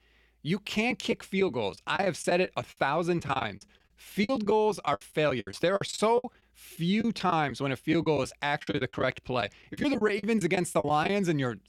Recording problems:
choppy; very; 15% of the speech affected

